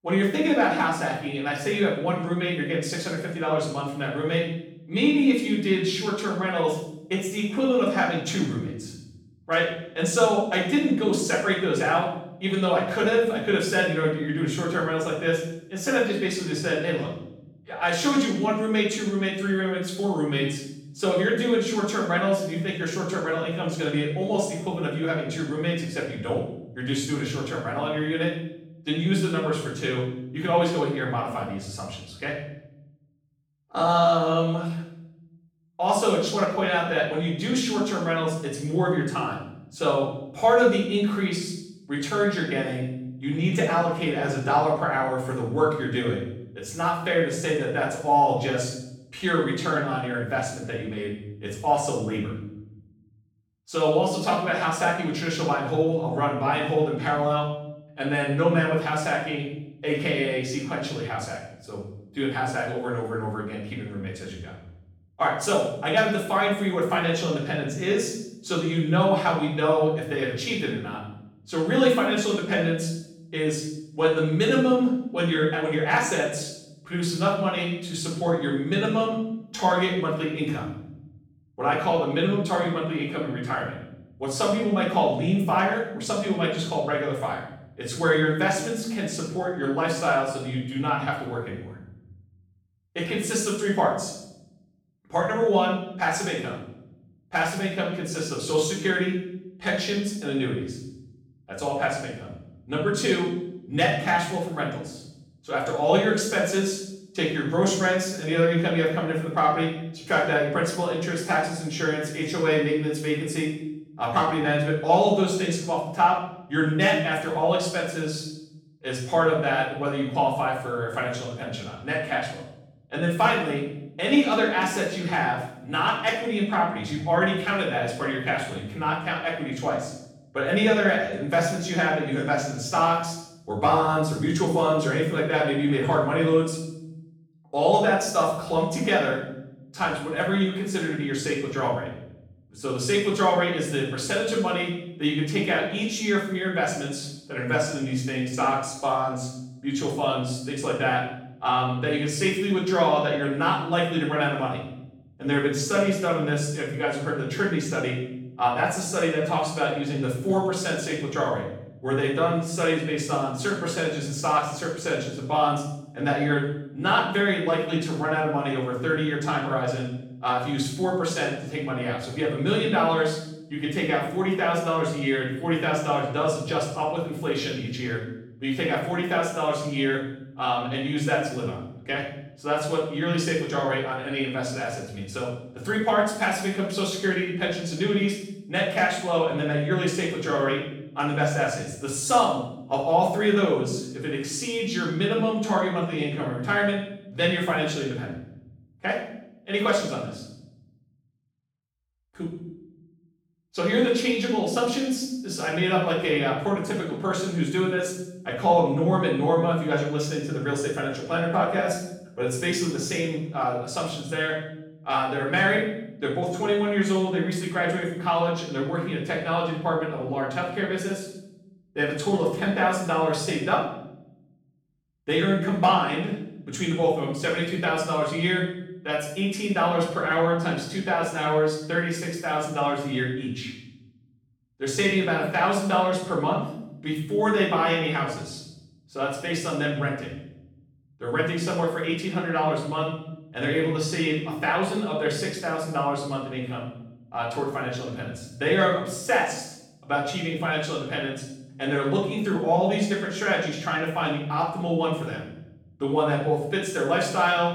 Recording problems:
off-mic speech; far
room echo; noticeable; dies away in 0.8 s

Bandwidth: 18 kHz